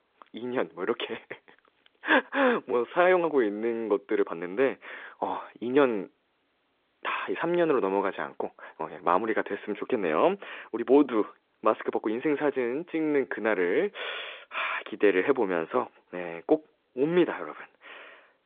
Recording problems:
phone-call audio; nothing above 3.5 kHz
uneven, jittery; strongly; from 1 to 17 s

